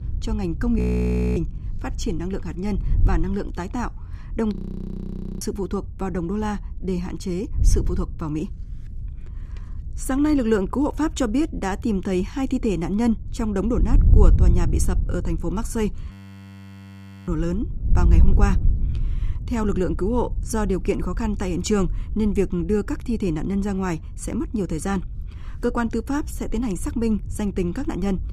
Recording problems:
wind noise on the microphone; occasional gusts; 15 dB below the speech
audio freezing; at 1 s for 0.5 s, at 4.5 s for 1 s and at 16 s for 1 s

